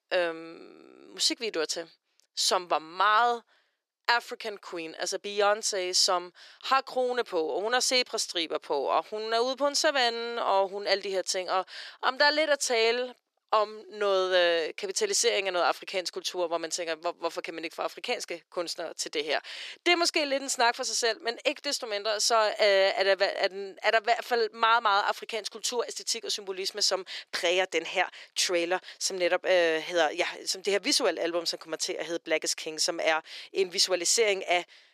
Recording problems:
thin; very; fading below 350 Hz

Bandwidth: 14 kHz